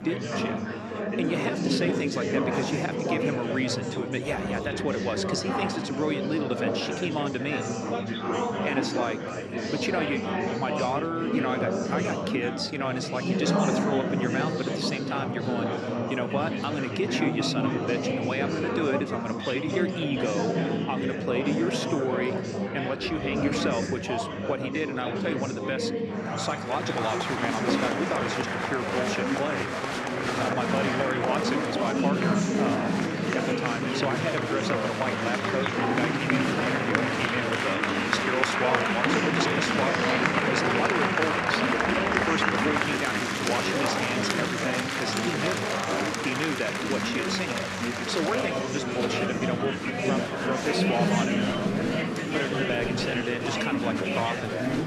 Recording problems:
chatter from many people; very loud; throughout; 4 dB above the speech

